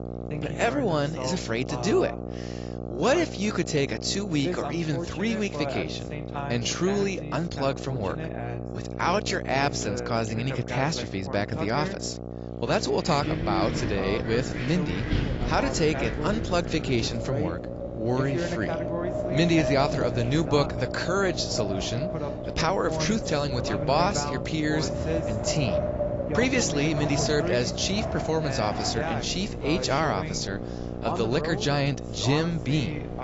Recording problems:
high frequencies cut off; noticeable; nothing above 7.5 kHz
garbled, watery; slightly
wind in the background; loud; from 13 s on; 7 dB below the speech
voice in the background; loud; throughout; 8 dB below the speech
electrical hum; noticeable; throughout; 60 Hz, 10 dB below the speech

